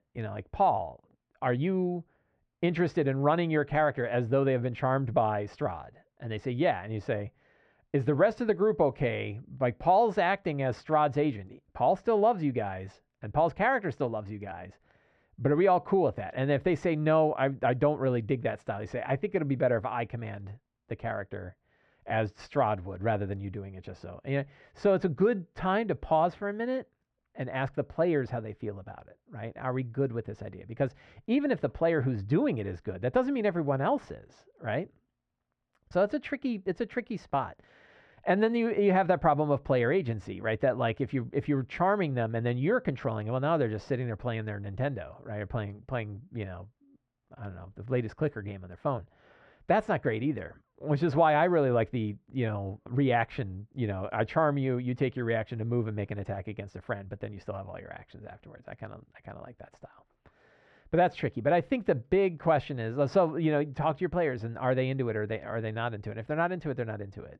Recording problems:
muffled; very; fading above 2 kHz

